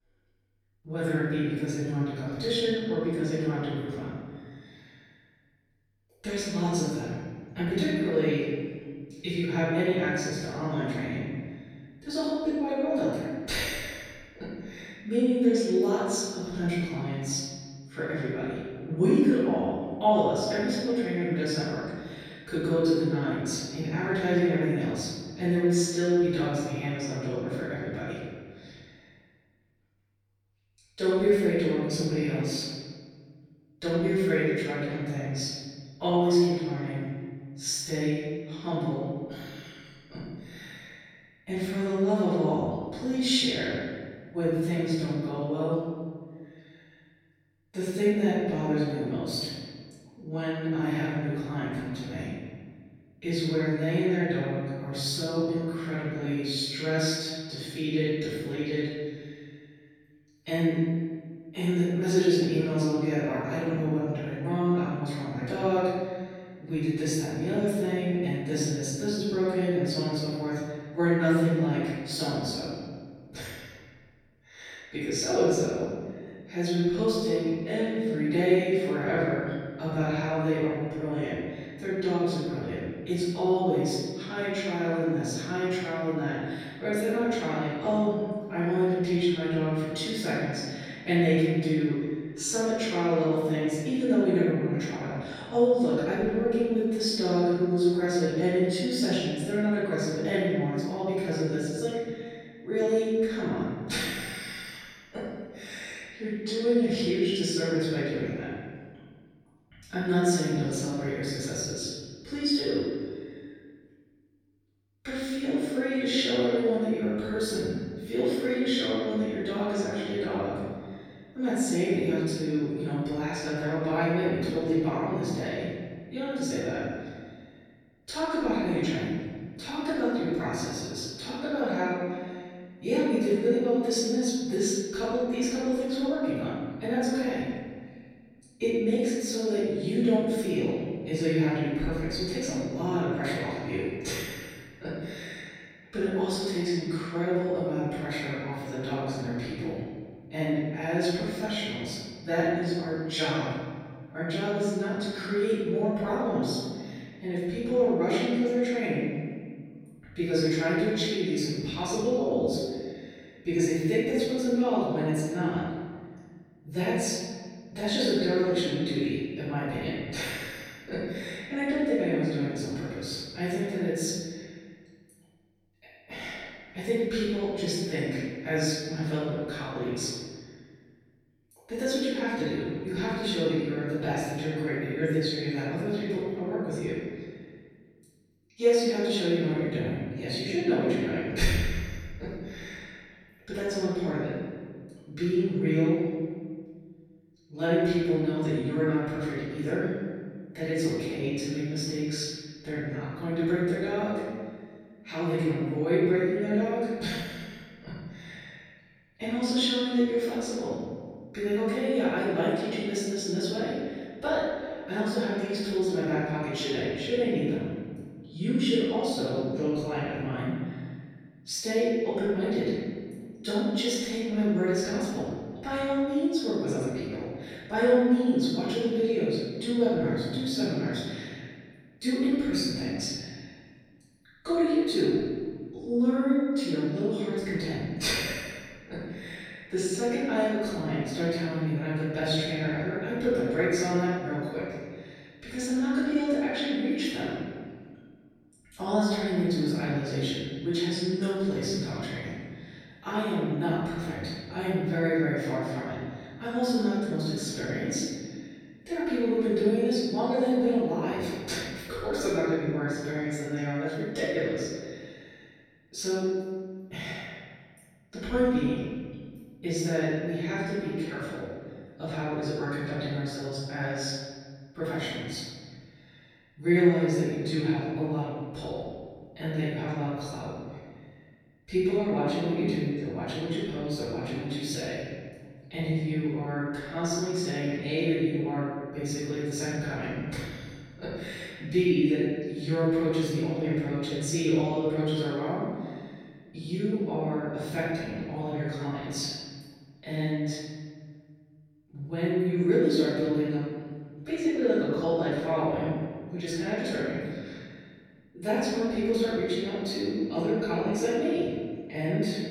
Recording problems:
room echo; strong; dies away in 1.7 s
off-mic speech; far

